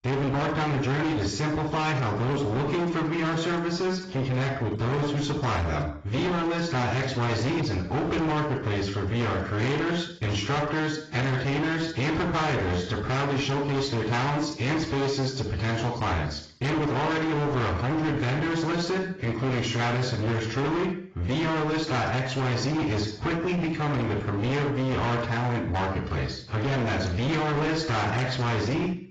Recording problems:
distortion; heavy; 40% of the sound clipped
off-mic speech; far
garbled, watery; badly; nothing above 7.5 kHz
room echo; slight; dies away in 0.5 s

